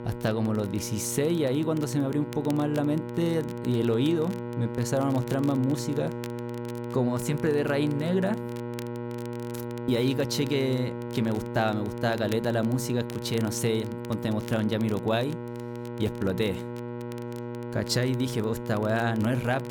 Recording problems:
electrical hum; loud; throughout; 60 Hz, 8 dB below the speech
crackle, like an old record; faint; 25 dB below the speech

